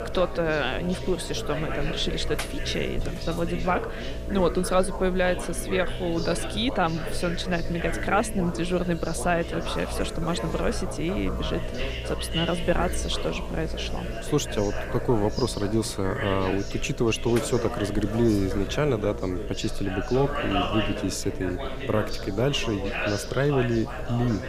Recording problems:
background chatter; loud; throughout; 3 voices, 8 dB below the speech
electrical hum; noticeable; throughout; 60 Hz, 10 dB below the speech

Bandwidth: 15.5 kHz